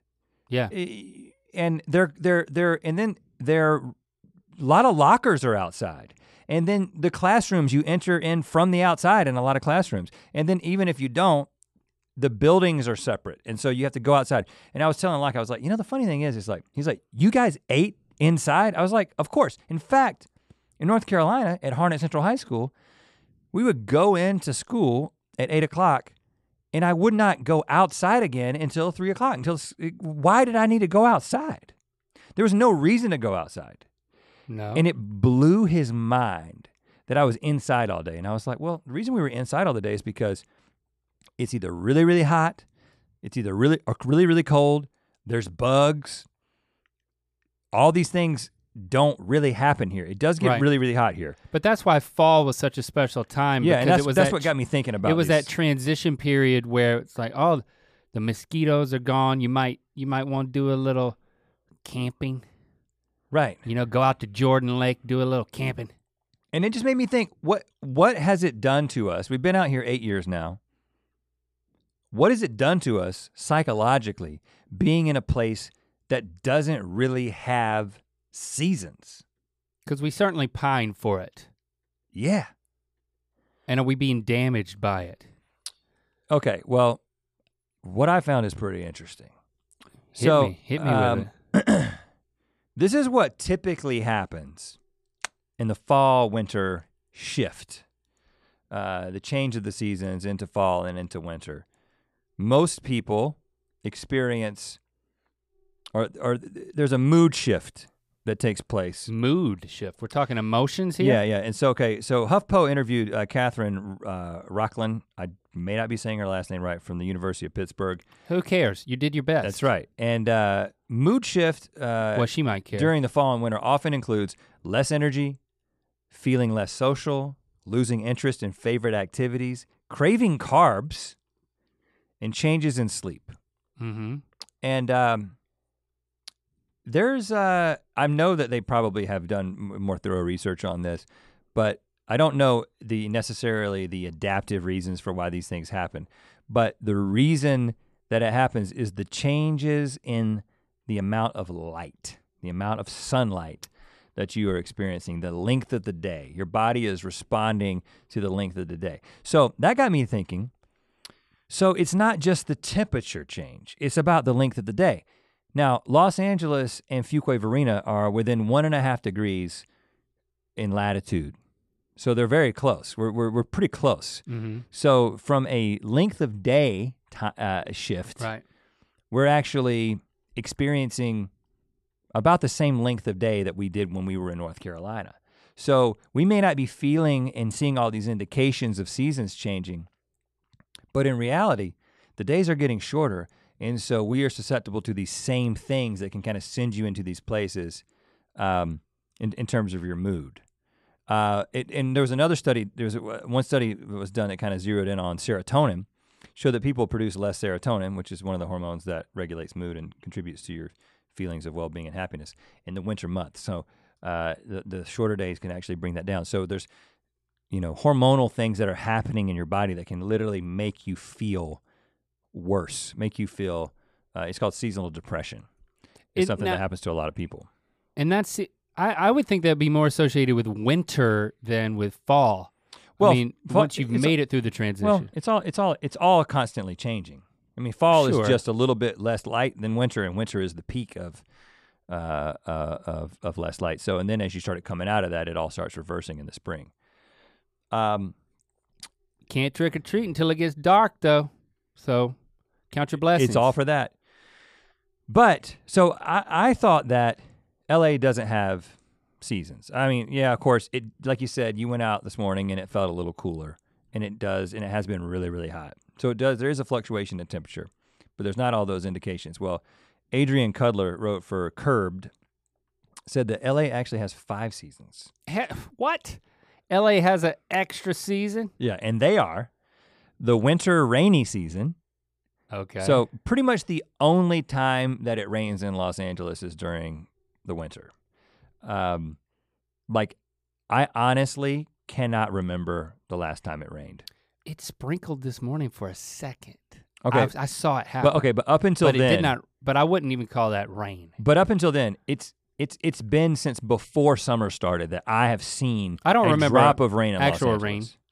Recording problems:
none

